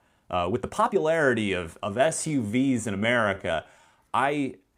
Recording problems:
uneven, jittery; strongly; until 4 s

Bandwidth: 15.5 kHz